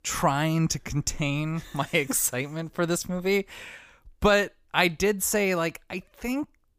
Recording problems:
none

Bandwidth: 15 kHz